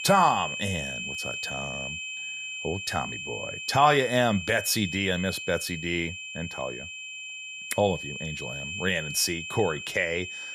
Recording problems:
high-pitched whine; loud; throughout; 2.5 kHz, 7 dB below the speech

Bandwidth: 15 kHz